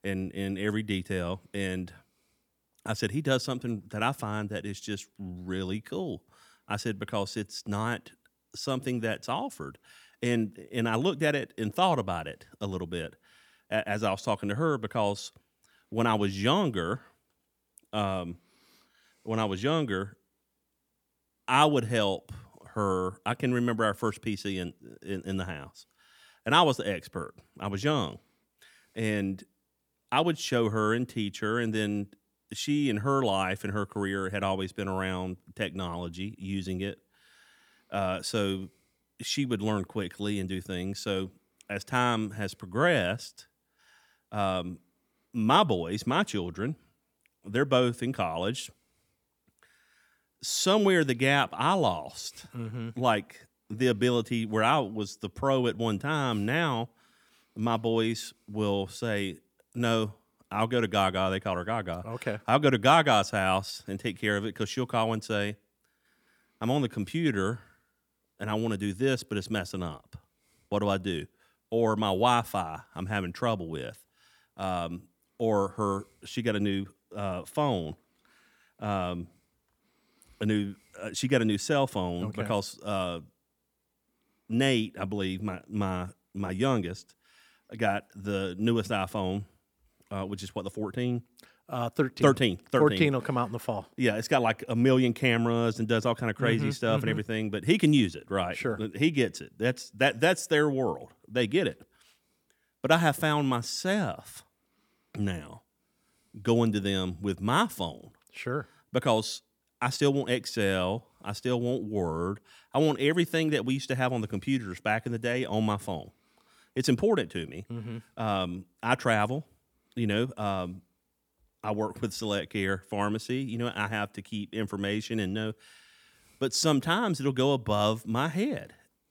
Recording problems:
none

